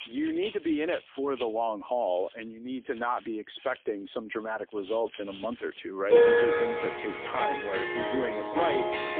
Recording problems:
phone-call audio; poor line; nothing above 3.5 kHz
background music; very loud; throughout; 6 dB above the speech

